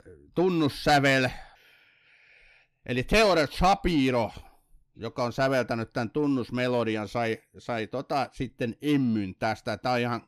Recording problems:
distortion; slight; 10 dB below the speech

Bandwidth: 14.5 kHz